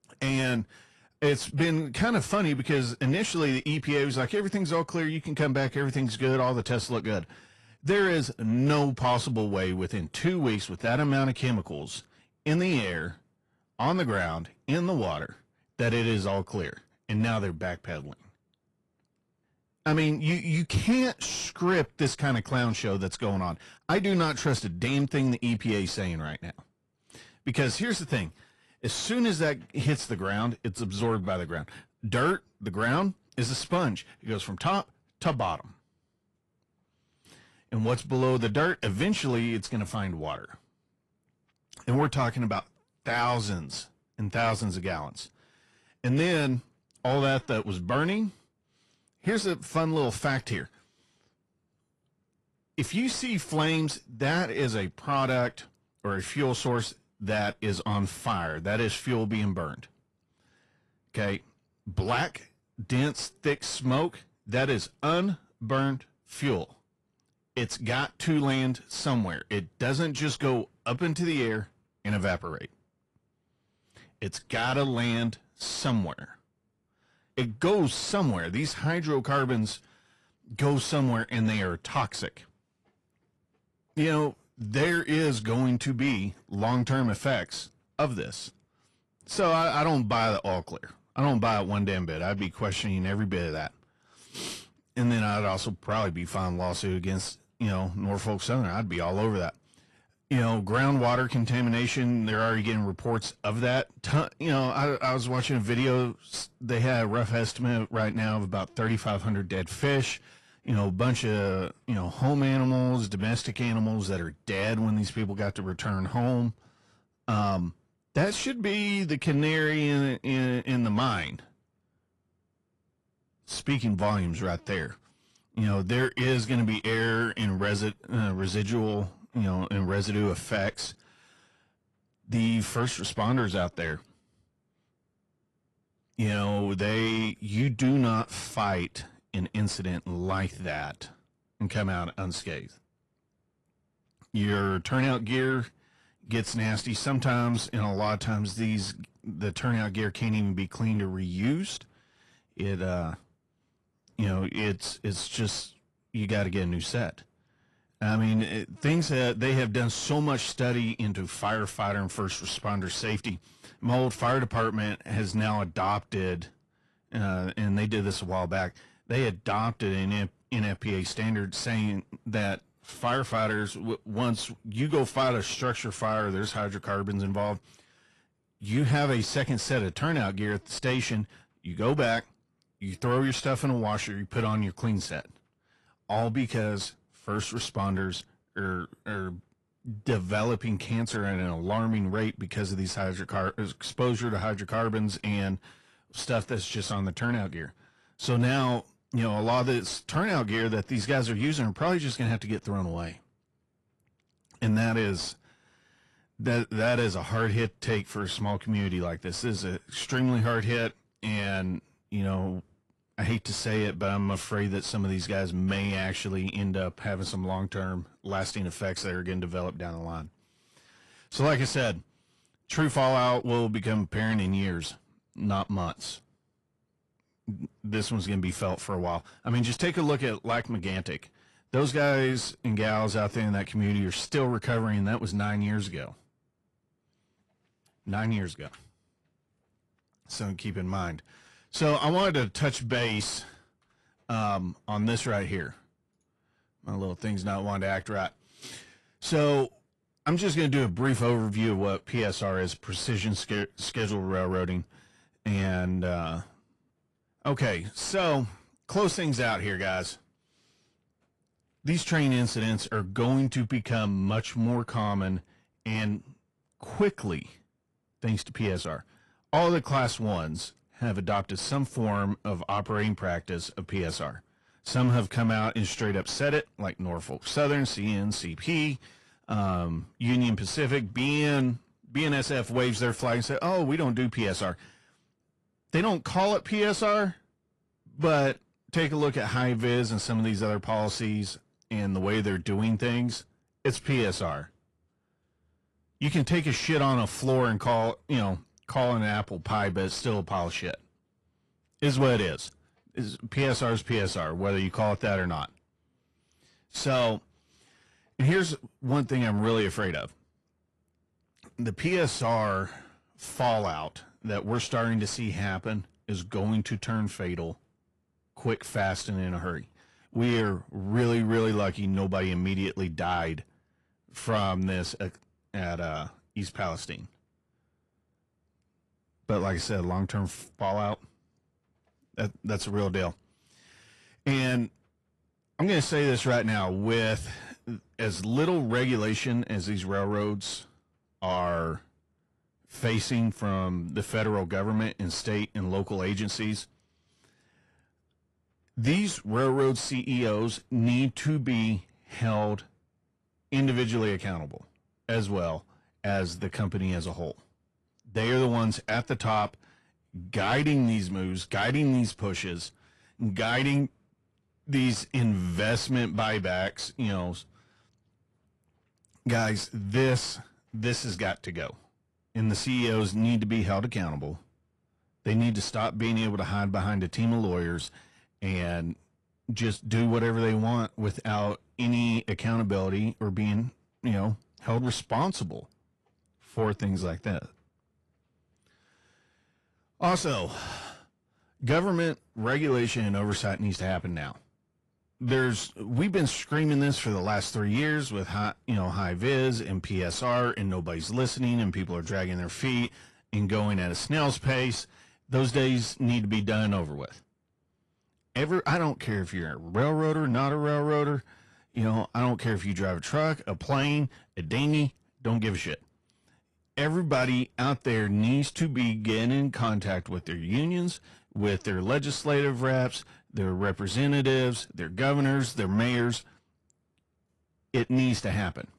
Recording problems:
distortion; slight; 10 dB below the speech
garbled, watery; slightly

